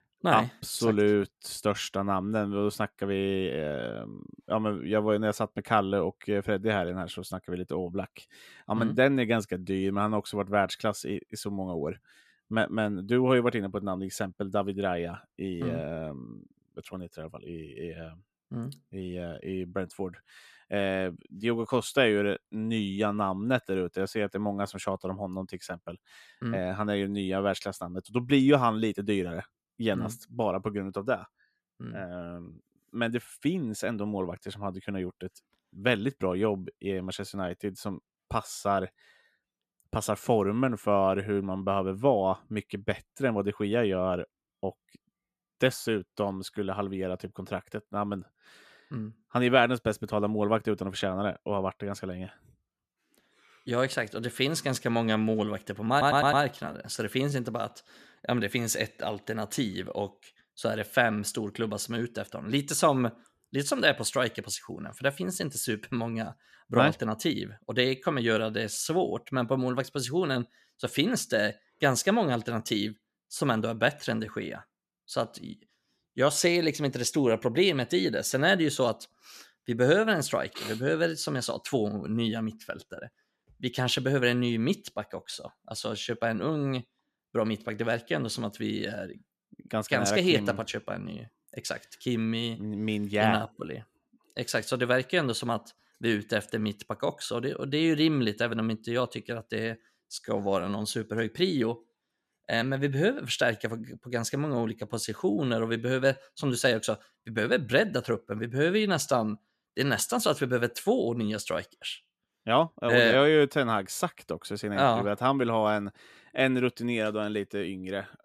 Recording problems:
audio stuttering; at 56 s

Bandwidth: 14.5 kHz